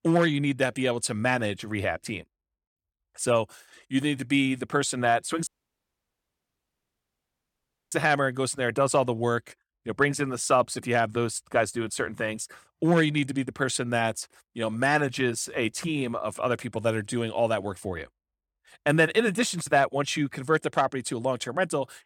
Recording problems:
audio cutting out; at 5.5 s for 2.5 s

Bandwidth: 17 kHz